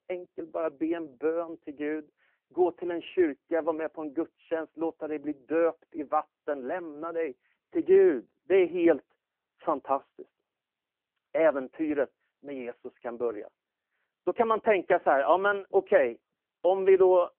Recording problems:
phone-call audio; nothing above 3 kHz

